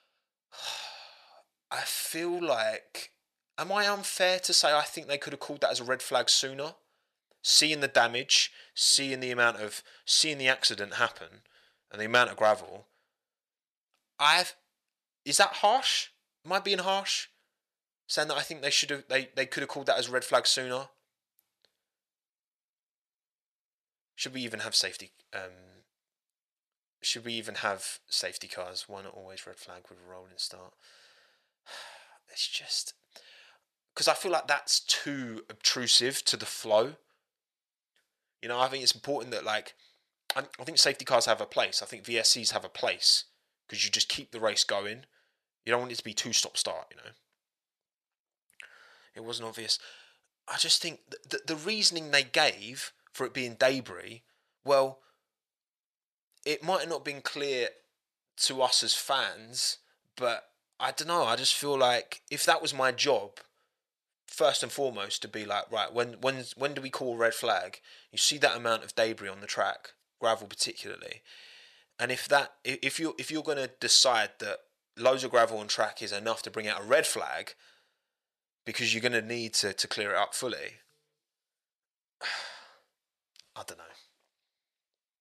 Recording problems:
thin; somewhat; fading below 800 Hz

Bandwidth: 13.5 kHz